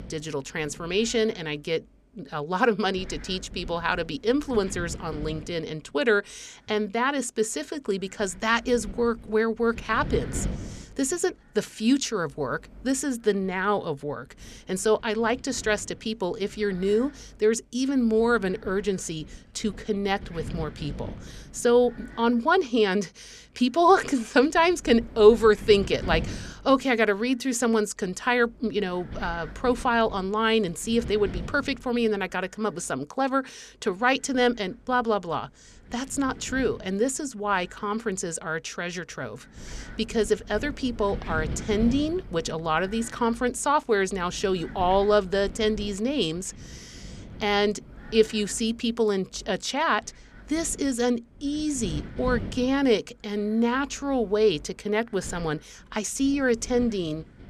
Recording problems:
wind noise on the microphone; occasional gusts; 20 dB below the speech

